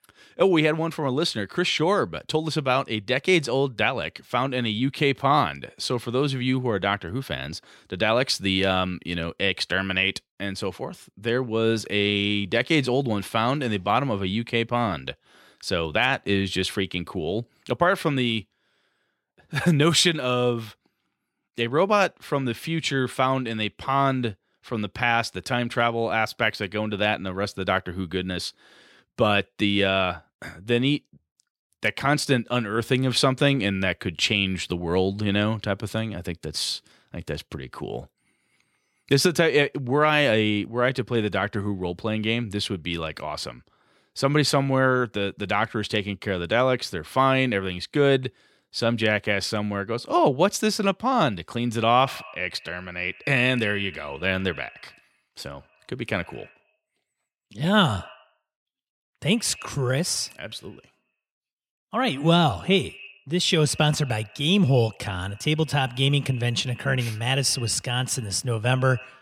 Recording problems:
echo of what is said; faint; from 52 s on; 90 ms later, 20 dB below the speech

